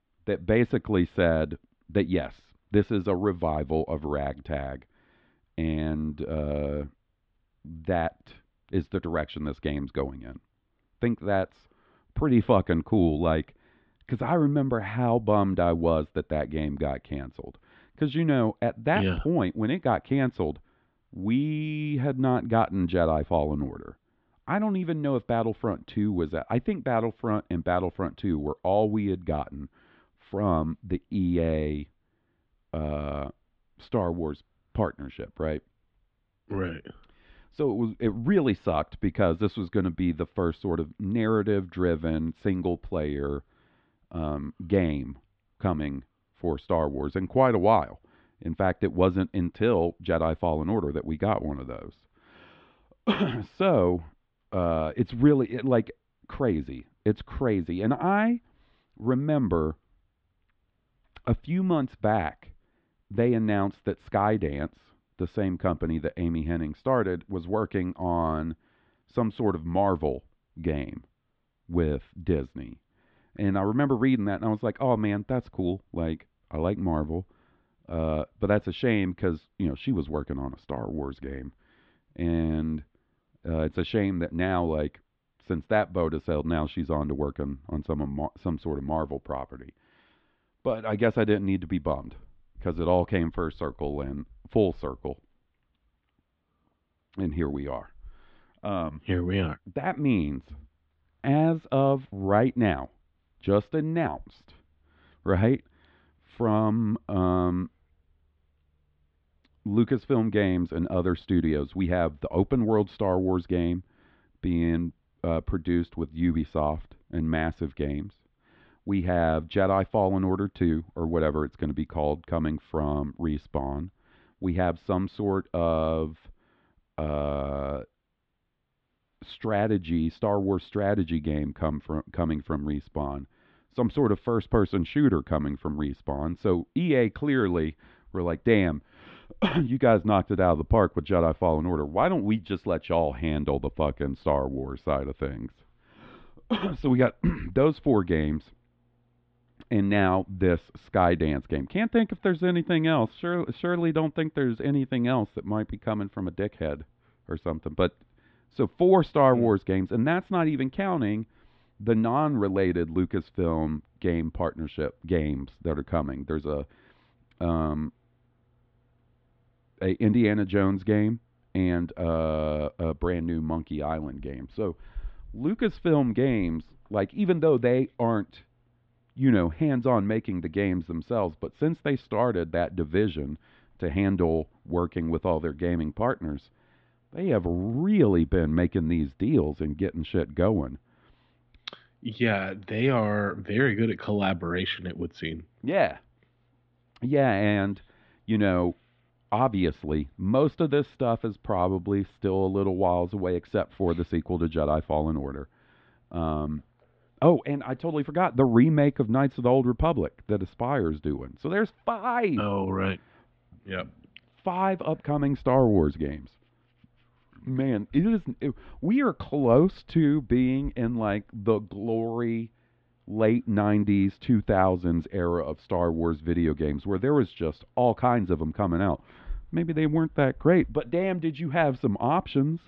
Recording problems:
muffled; very; fading above 3.5 kHz

